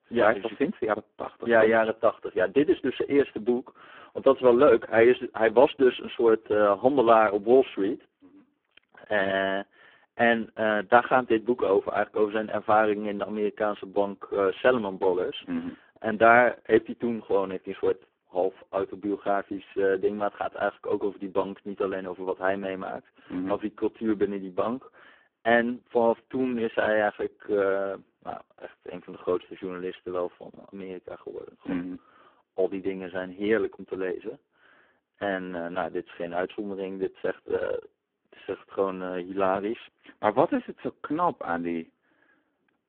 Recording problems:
phone-call audio; poor line

